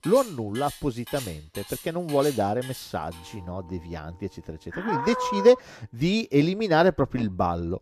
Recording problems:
household noises; noticeable; throughout; 15 dB below the speech

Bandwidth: 14 kHz